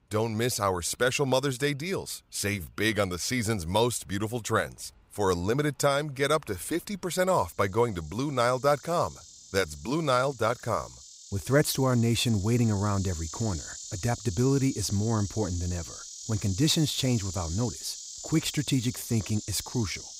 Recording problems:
animal sounds; noticeable; throughout; 10 dB below the speech

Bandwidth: 15.5 kHz